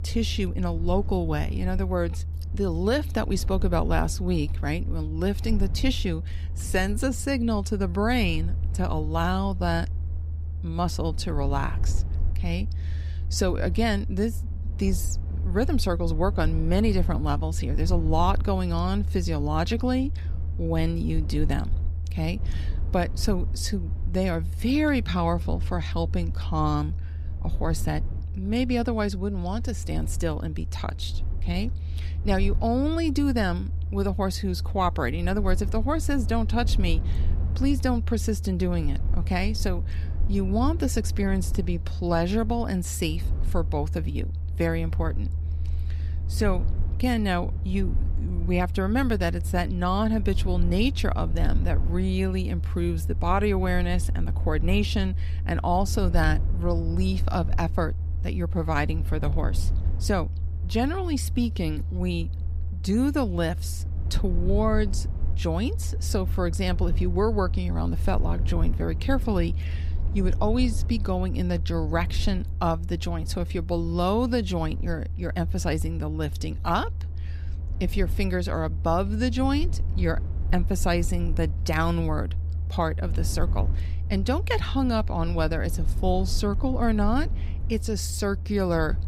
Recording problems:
low rumble; noticeable; throughout; 15 dB below the speech

